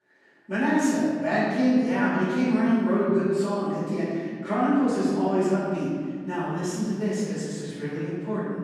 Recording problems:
room echo; strong; dies away in 1.9 s
off-mic speech; far

